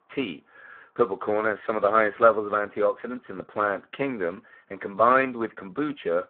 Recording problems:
phone-call audio; poor line

